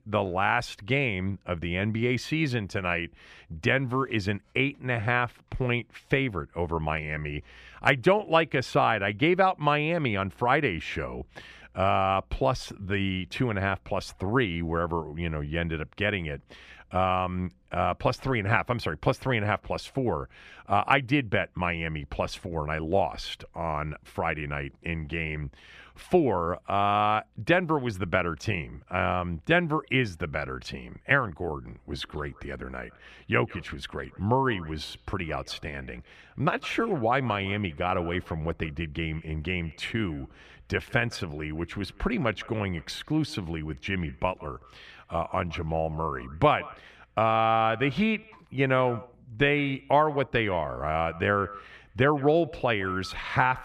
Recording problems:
echo of what is said; faint; from 32 s on; 160 ms later, 20 dB below the speech

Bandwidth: 14.5 kHz